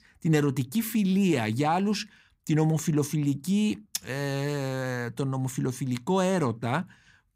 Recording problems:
none

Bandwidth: 15.5 kHz